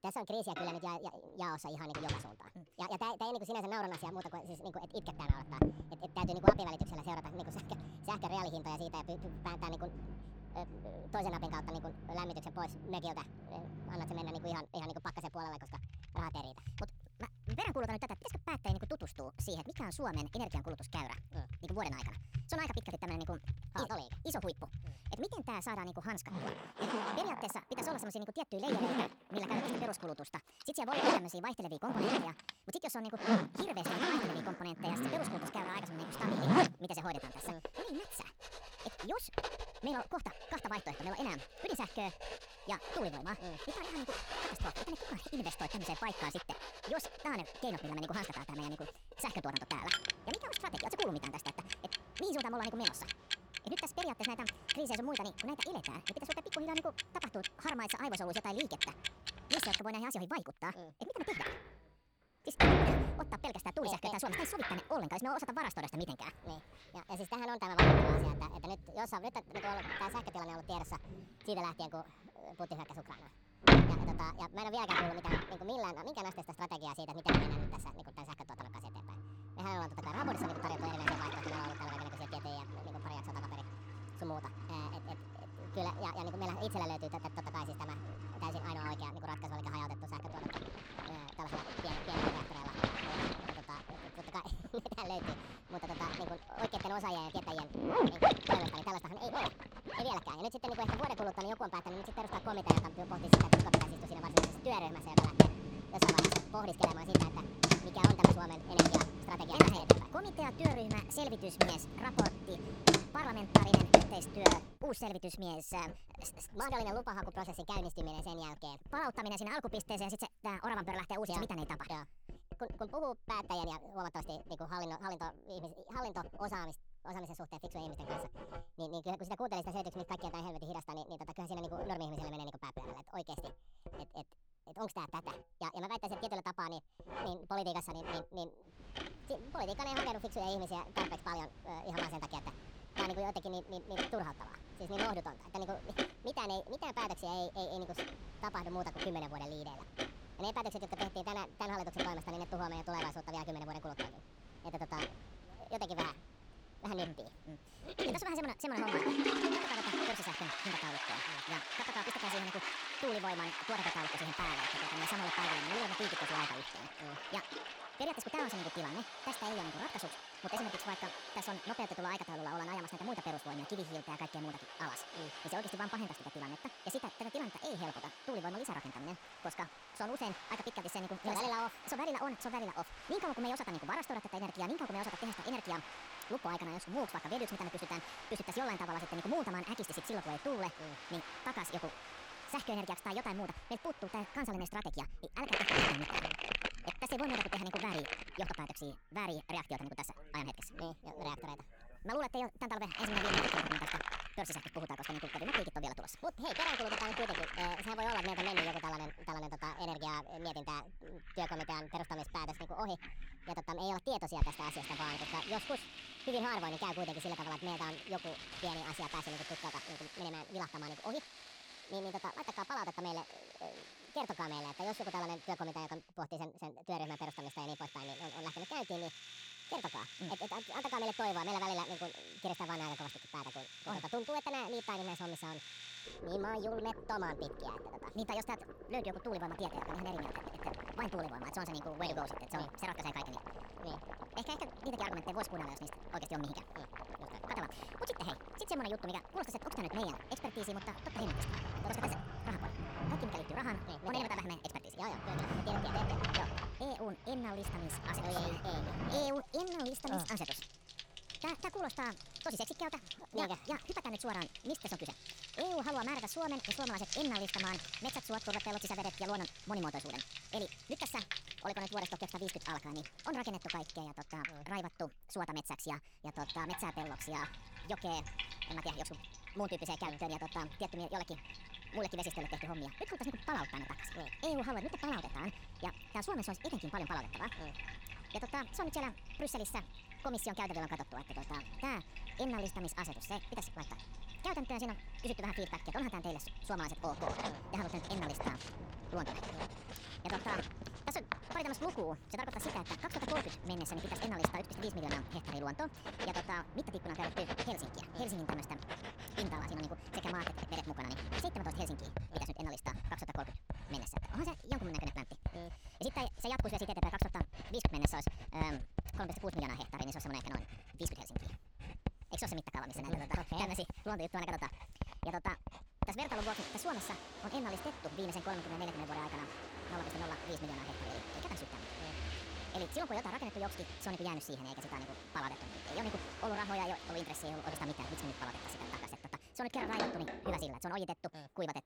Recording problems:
wrong speed and pitch; too fast and too high; 1.6 times normal speed
household noises; very loud; throughout; 4 dB above the speech

